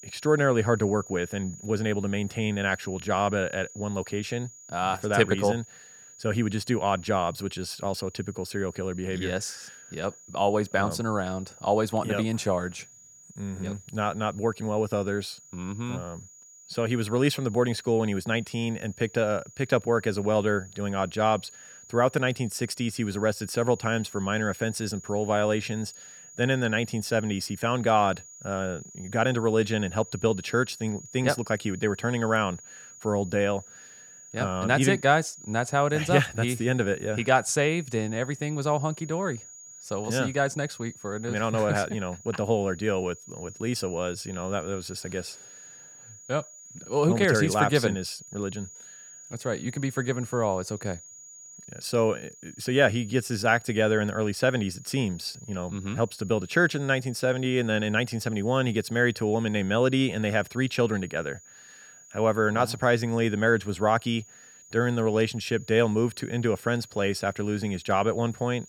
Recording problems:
high-pitched whine; noticeable; throughout; 7 kHz, 20 dB below the speech

